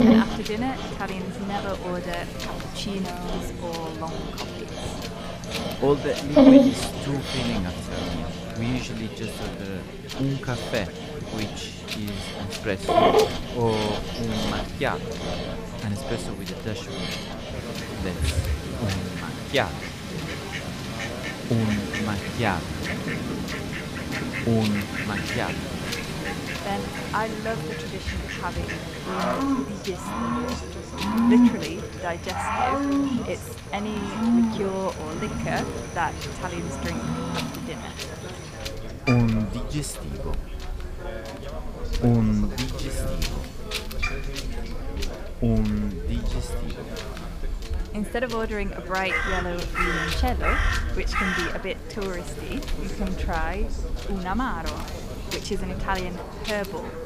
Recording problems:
animal sounds; very loud; throughout; 2 dB above the speech
wind noise on the microphone; heavy; 9 dB below the speech
background chatter; loud; throughout; 4 voices, 9 dB below the speech

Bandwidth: 15 kHz